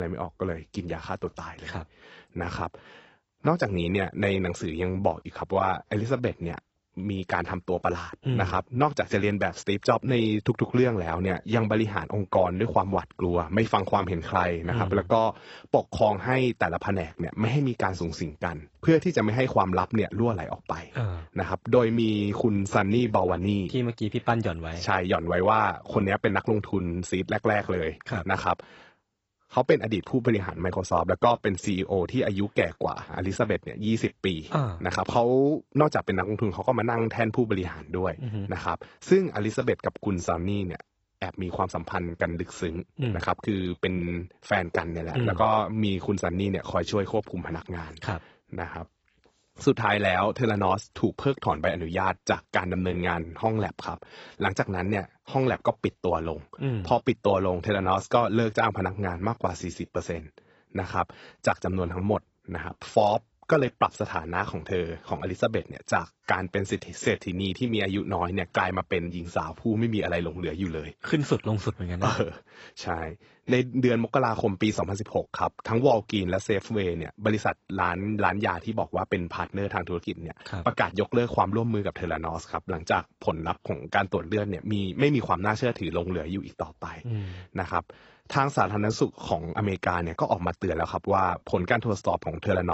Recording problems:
garbled, watery; badly; nothing above 8 kHz
abrupt cut into speech; at the start and the end

